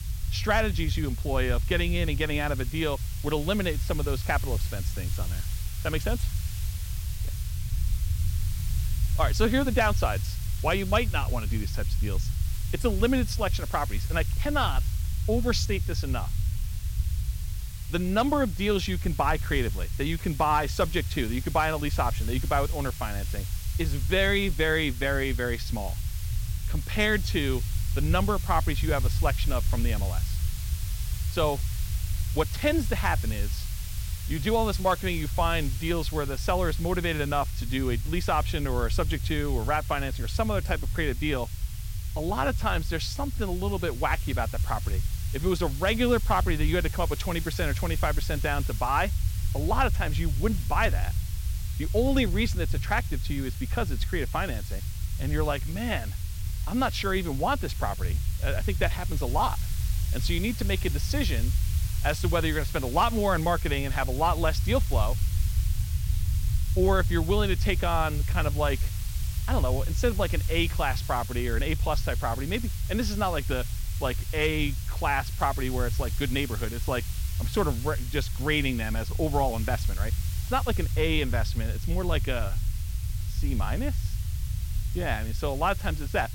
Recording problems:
hiss; noticeable; throughout; 15 dB below the speech
low rumble; faint; throughout; 20 dB below the speech

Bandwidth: 16.5 kHz